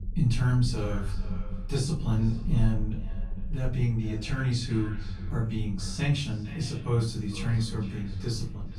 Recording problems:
off-mic speech; far
echo of what is said; faint; throughout; 460 ms later, 20 dB below the speech
room echo; slight; dies away in 0.3 s
low rumble; noticeable; throughout; 15 dB below the speech

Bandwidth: 14.5 kHz